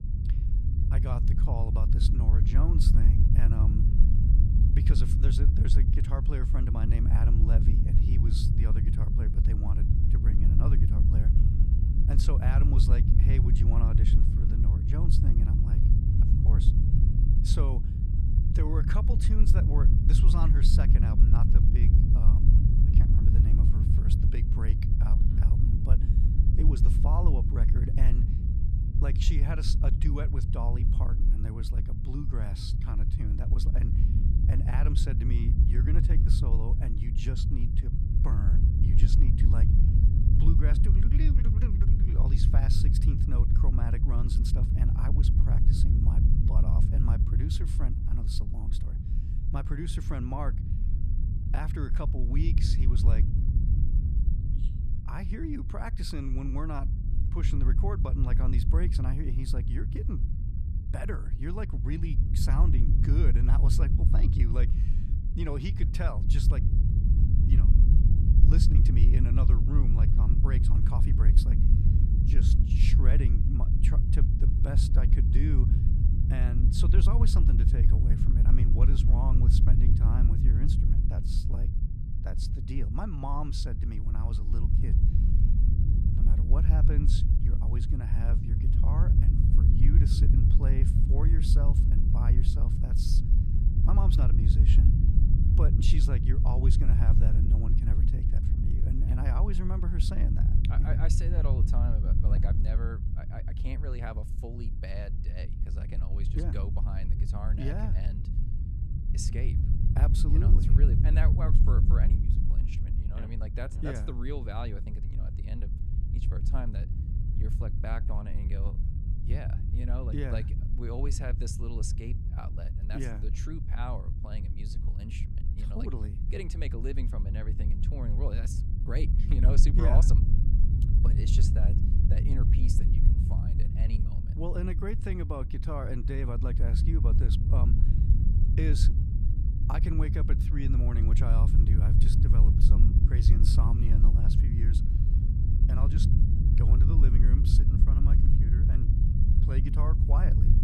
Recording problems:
low rumble; loud; throughout; as loud as the speech

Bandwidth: 14.5 kHz